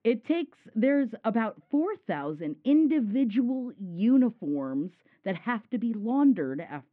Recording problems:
muffled; very; fading above 2.5 kHz

